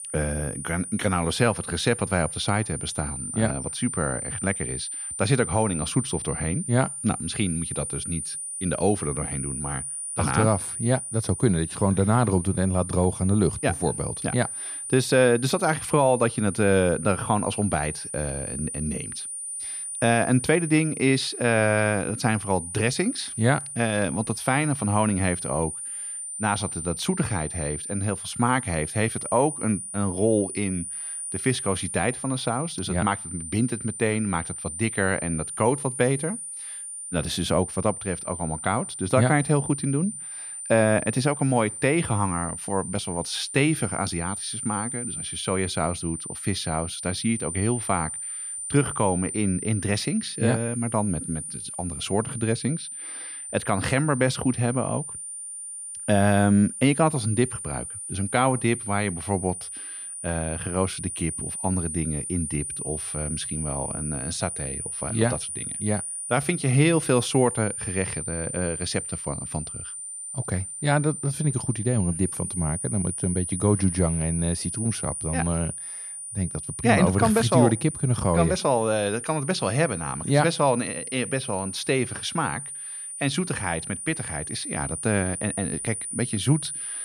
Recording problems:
high-pitched whine; loud; throughout; 9.5 kHz, 6 dB below the speech

